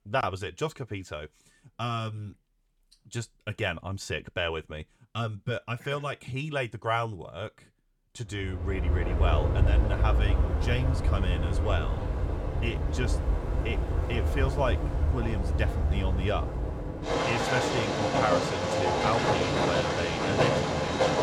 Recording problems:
train or aircraft noise; very loud; from 9 s on; 5 dB above the speech

